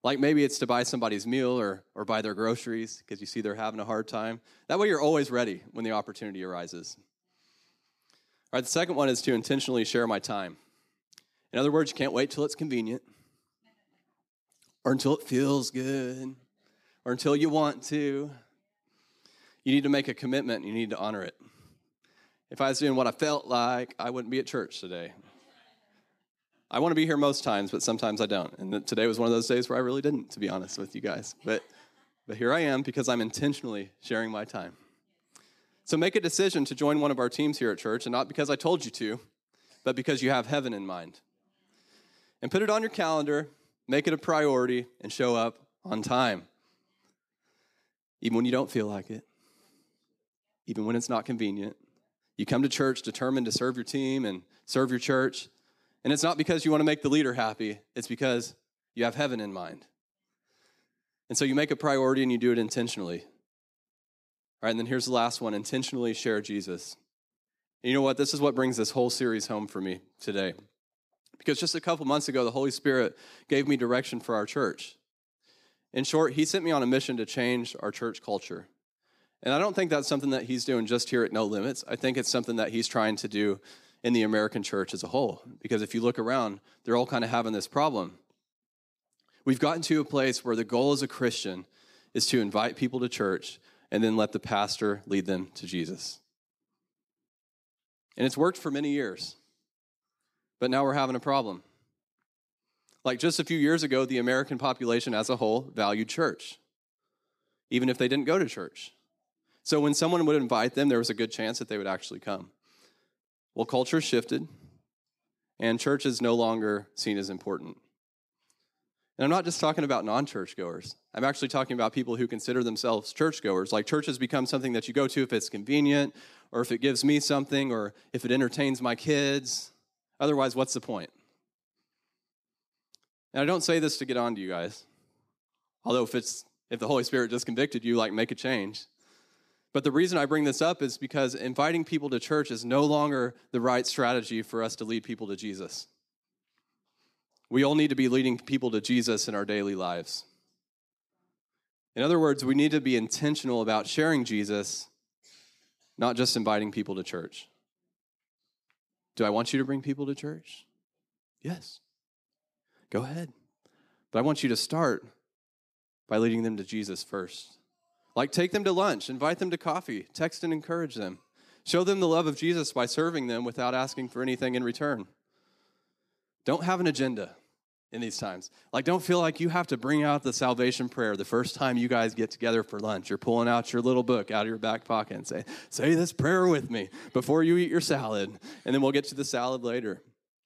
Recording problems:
none

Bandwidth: 14.5 kHz